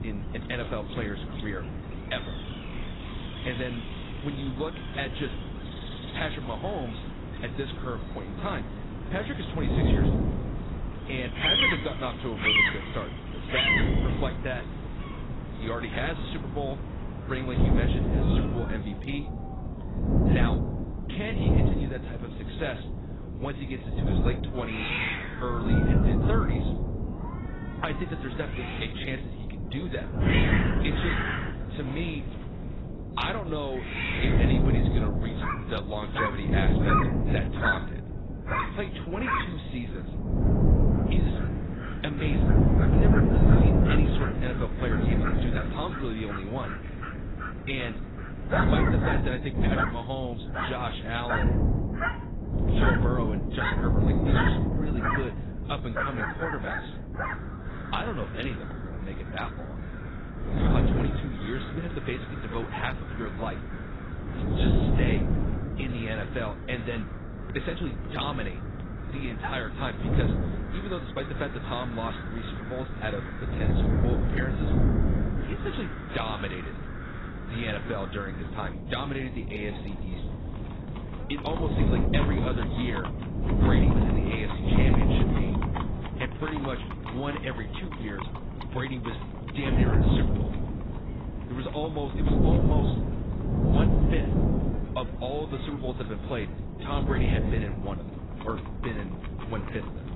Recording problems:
garbled, watery; badly; nothing above 4 kHz
animal sounds; very loud; throughout; as loud as the speech
wind noise on the microphone; heavy; 3 dB below the speech

